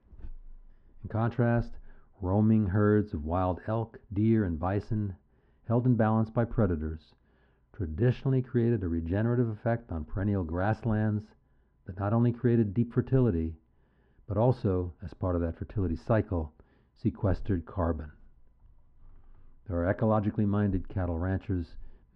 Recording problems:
muffled; very; fading above 1 kHz

